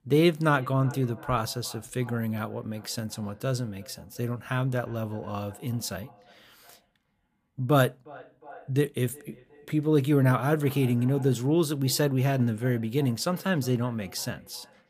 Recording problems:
echo of what is said; faint; throughout; 360 ms later, 25 dB below the speech

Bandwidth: 15 kHz